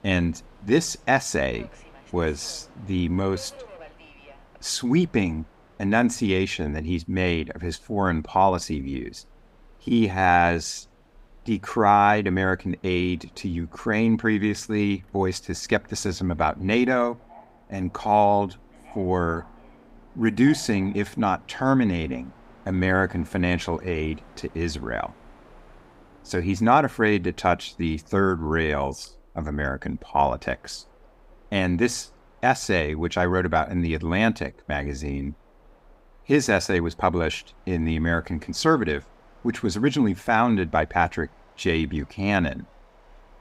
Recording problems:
train or aircraft noise; faint; throughout; 30 dB below the speech

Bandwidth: 15.5 kHz